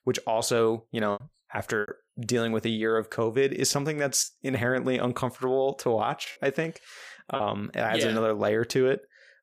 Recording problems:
choppy; occasionally; 3% of the speech affected

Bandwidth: 15 kHz